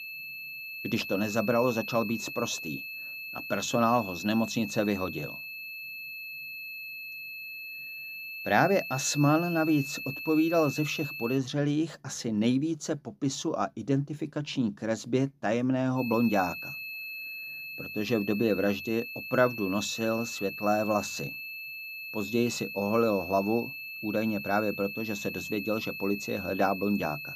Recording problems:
high-pitched whine; loud; until 11 s and from 16 s on; 2.5 kHz, 8 dB below the speech

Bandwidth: 15 kHz